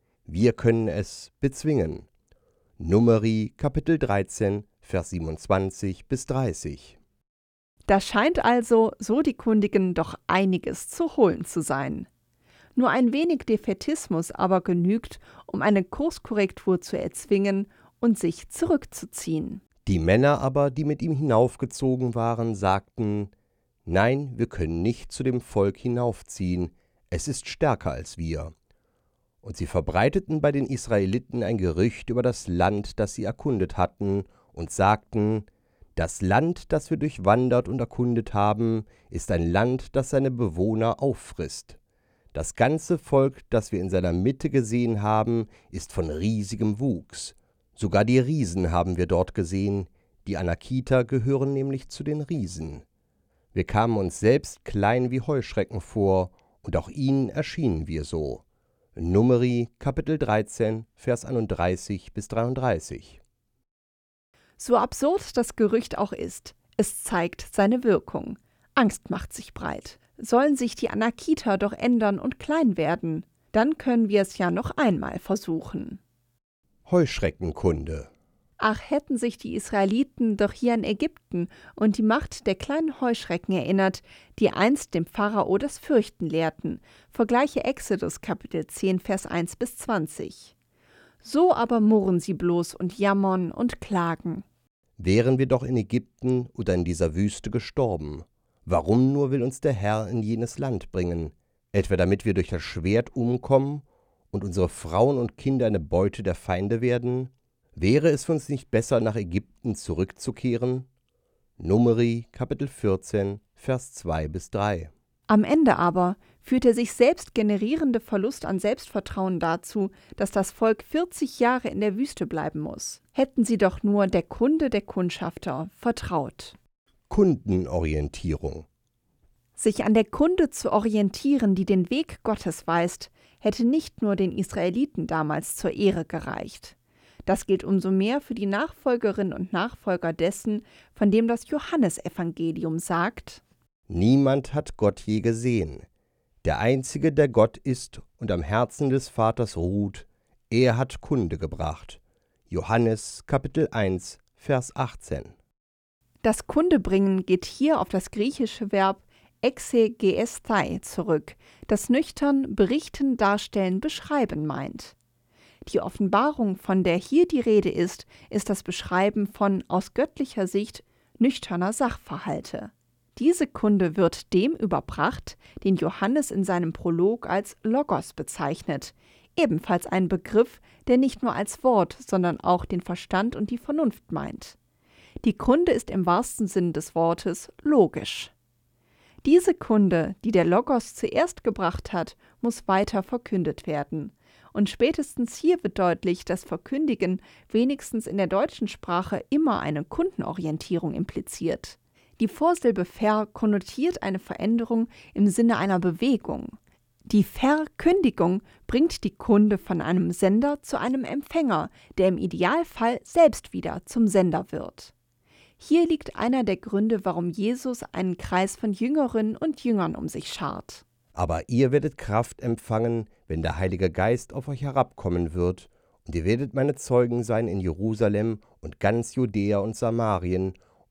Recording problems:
none

